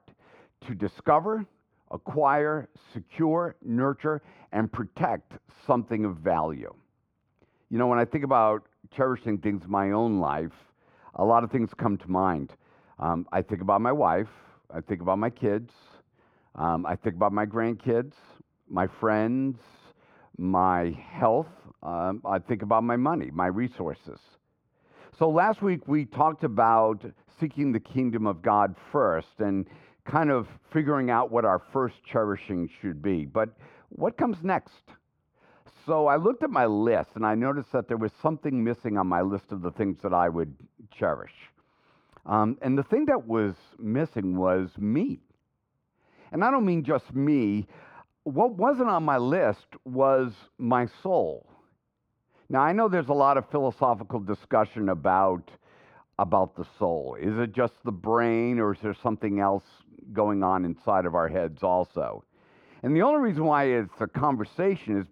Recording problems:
muffled; very; fading above 3 kHz

